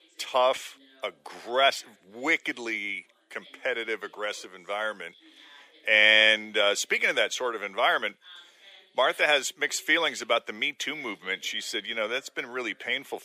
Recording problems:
thin; very; fading below 500 Hz
voice in the background; faint; throughout; 30 dB below the speech

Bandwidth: 15 kHz